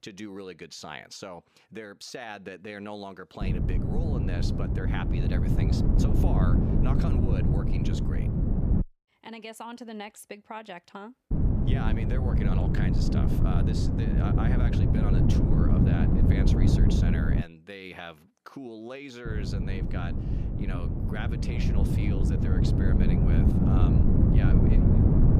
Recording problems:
wind noise on the microphone; heavy; from 3.5 to 9 s, from 11 to 17 s and from 19 s on; 4 dB above the speech

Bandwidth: 14.5 kHz